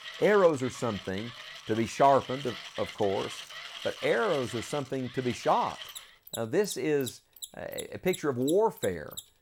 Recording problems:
machinery noise; noticeable; throughout; 15 dB below the speech

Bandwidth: 17 kHz